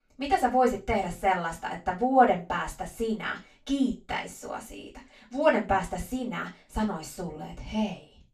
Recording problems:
off-mic speech; far
room echo; slight; dies away in 0.2 s

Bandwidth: 14 kHz